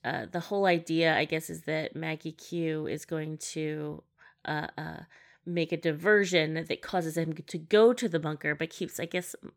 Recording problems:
none

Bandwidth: 17.5 kHz